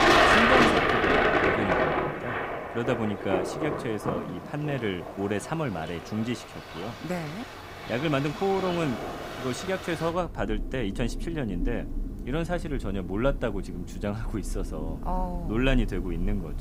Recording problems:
rain or running water; very loud; throughout; 3 dB above the speech

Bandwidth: 15.5 kHz